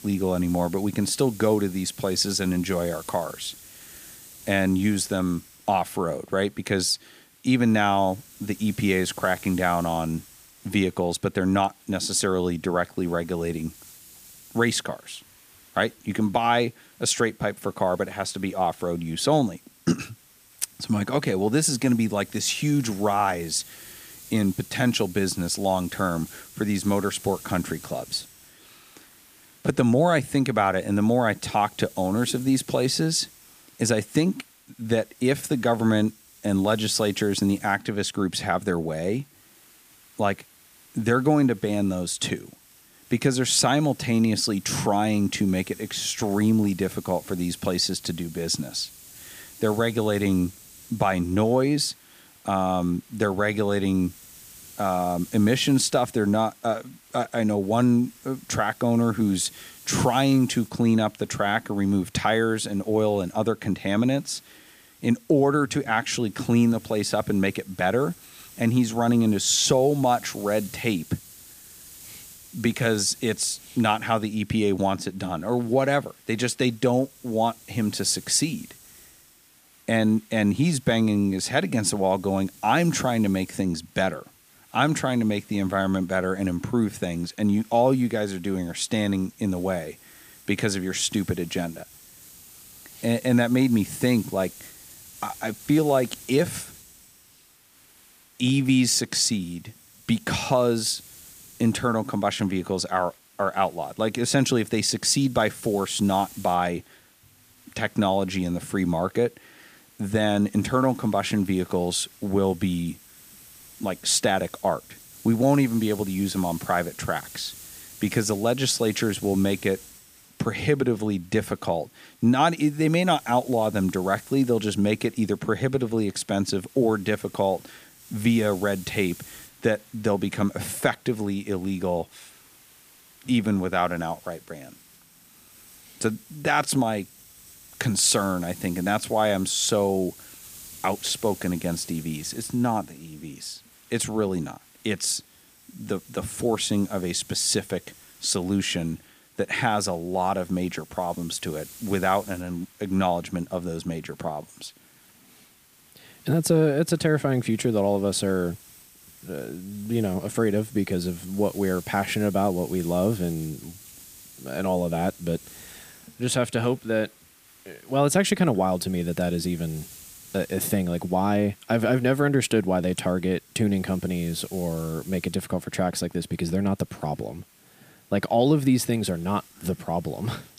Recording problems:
hiss; faint; throughout; 20 dB below the speech

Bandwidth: 15 kHz